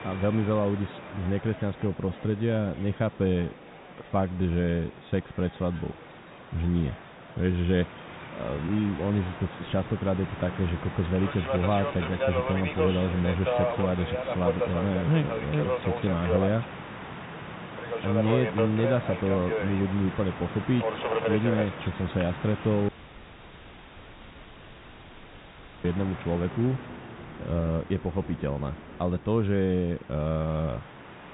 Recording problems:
high frequencies cut off; severe; nothing above 4 kHz
muffled; very slightly; fading above 3.5 kHz
train or aircraft noise; loud; throughout; 5 dB below the speech
audio cutting out; at 23 s for 3 s

